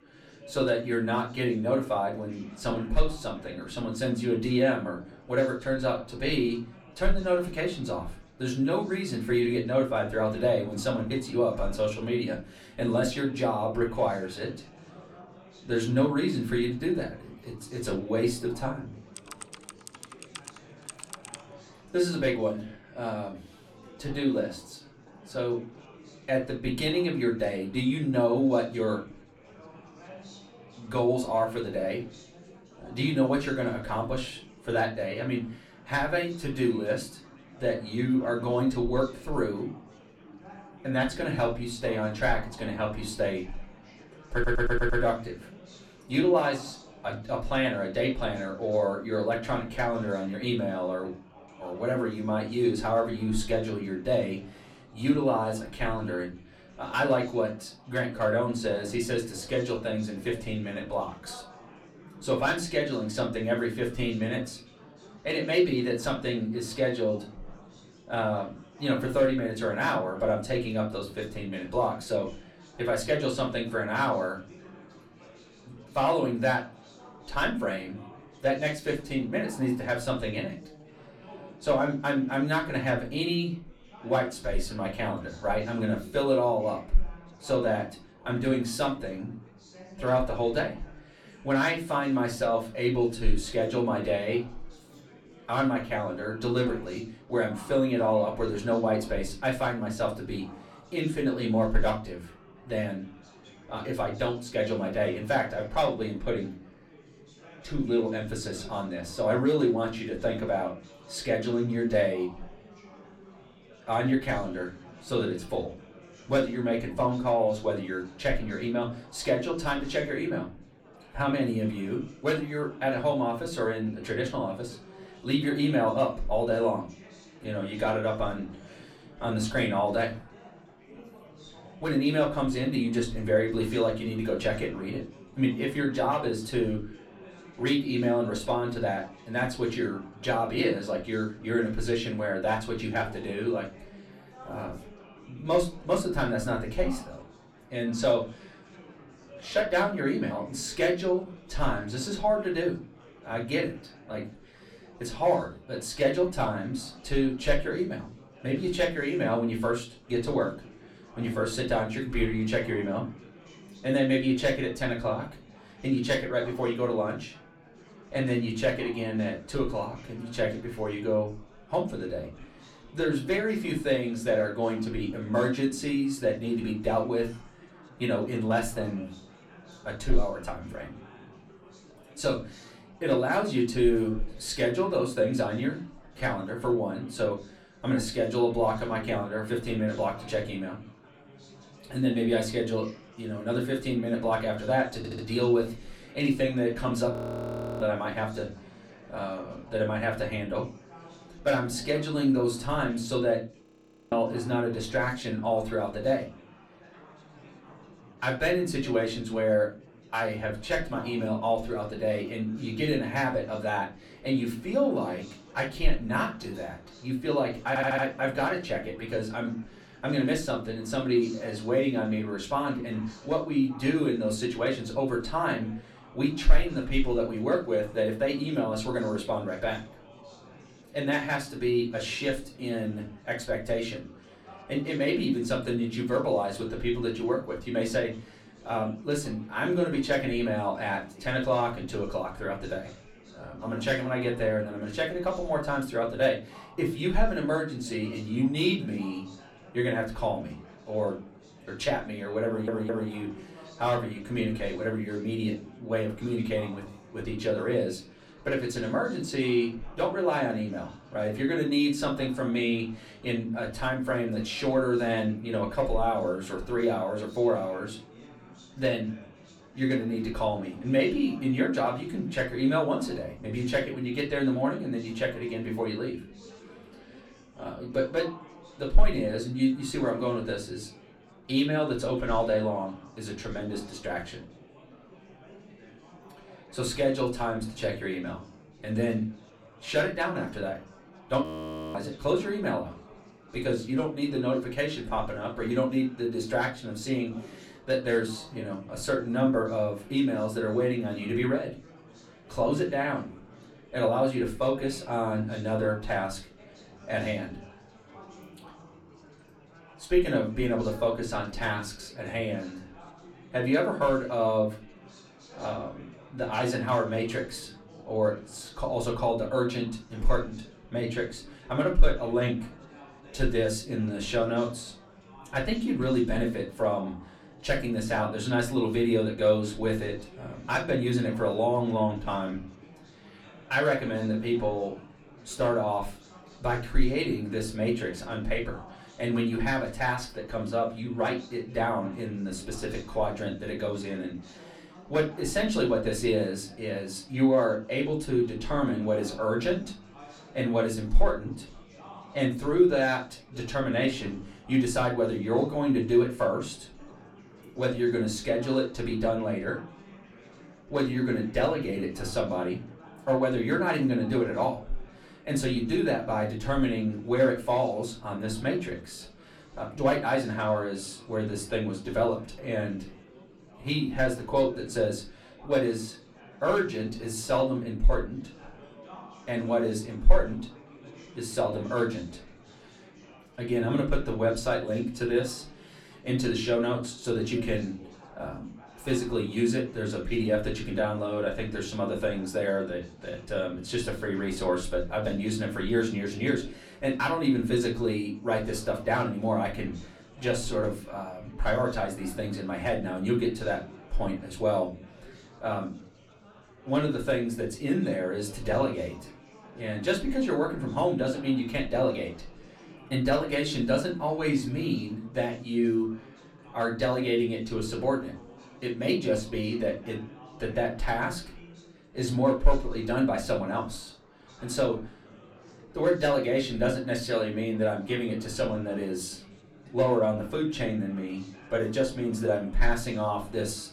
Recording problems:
off-mic speech; far
room echo; slight; dies away in 0.3 s
chatter from many people; faint; throughout; 20 dB below the speech
keyboard typing; faint; from 19 to 21 s; peak 10 dB below the speech
audio stuttering; 4 times, first at 44 s
audio freezing; at 3:17 for 0.5 s, at 3:24 and at 4:51 for 0.5 s

